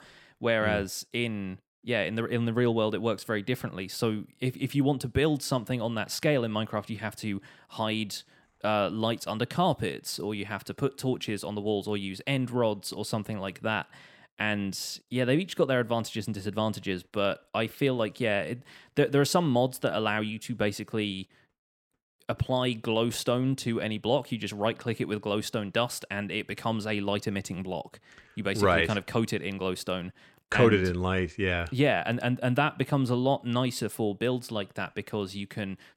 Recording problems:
none

